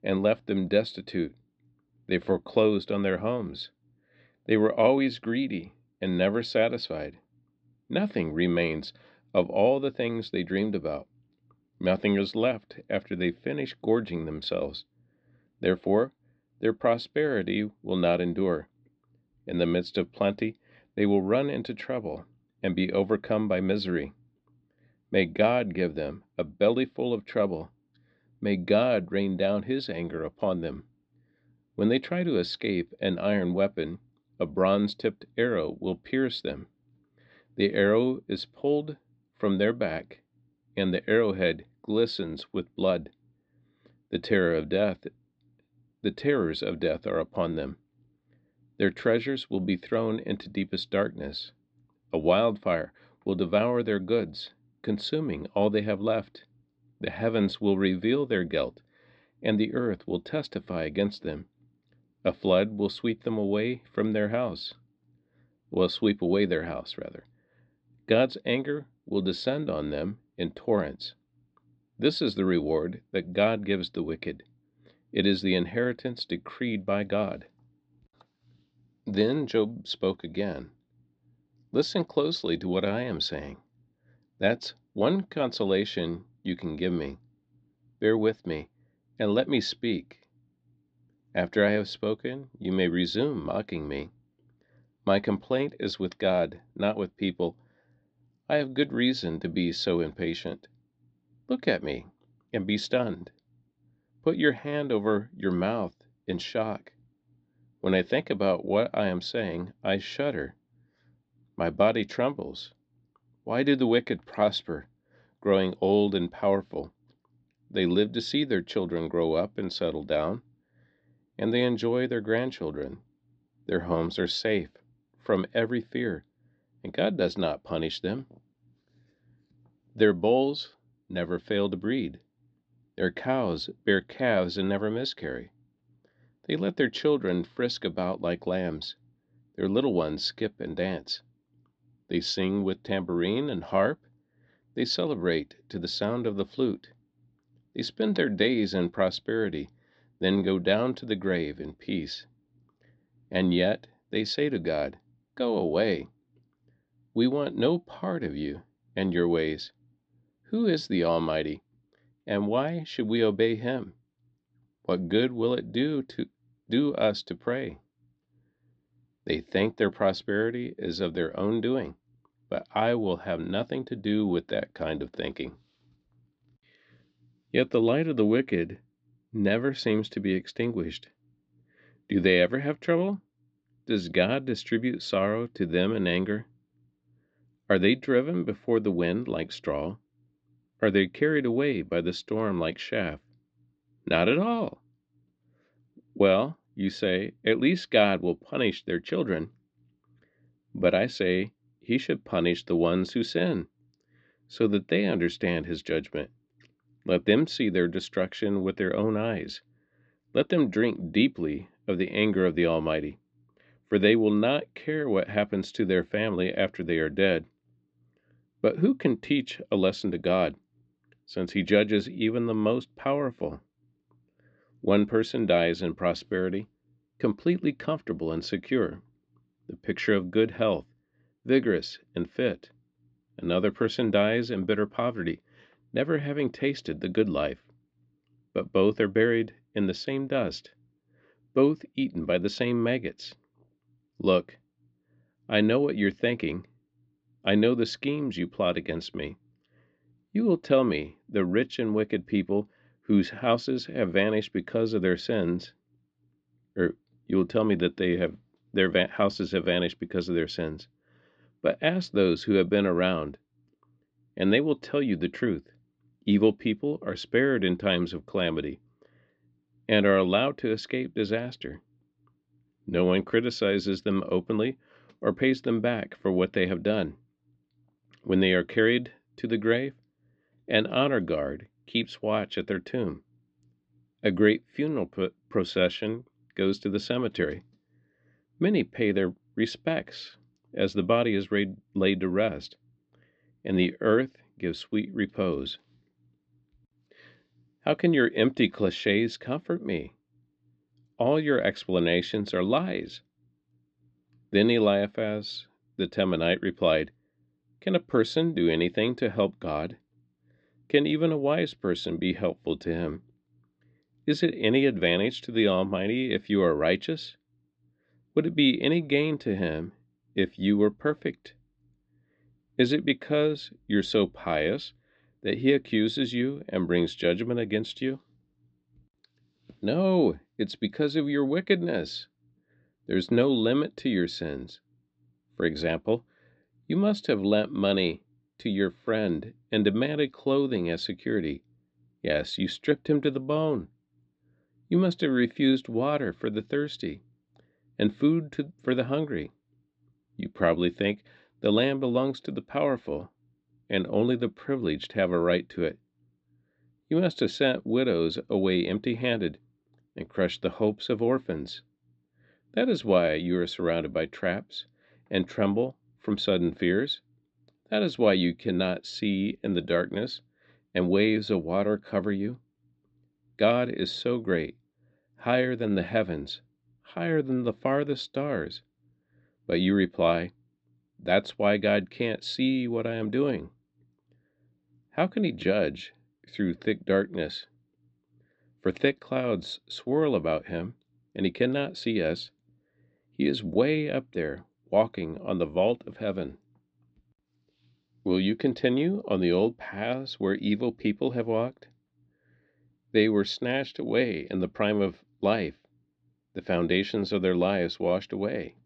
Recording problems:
muffled; slightly; fading above 4 kHz

